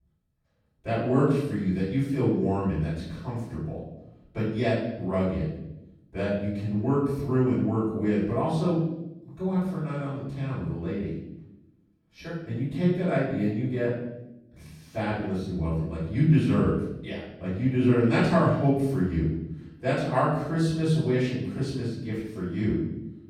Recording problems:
off-mic speech; far
room echo; noticeable; dies away in 0.9 s

